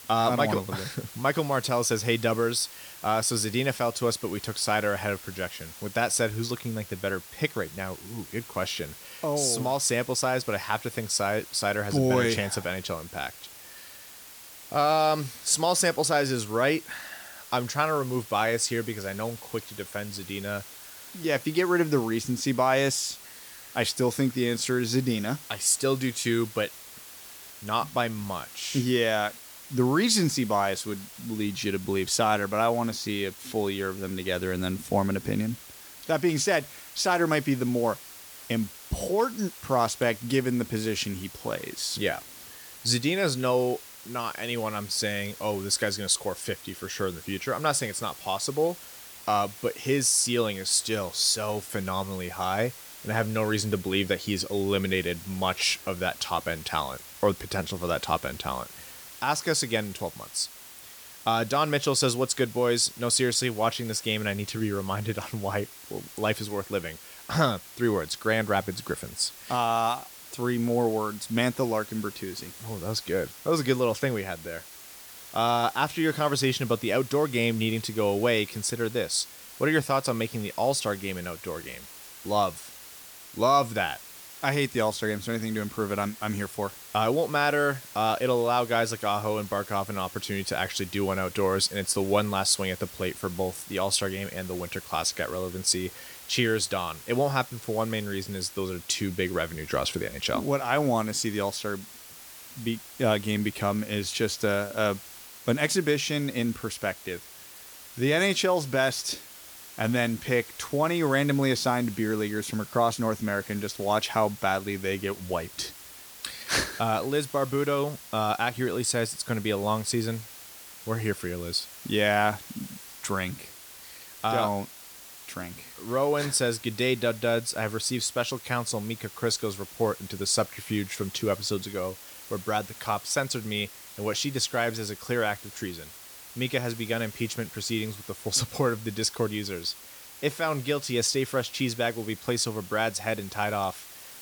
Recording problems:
hiss; noticeable; throughout; 15 dB below the speech

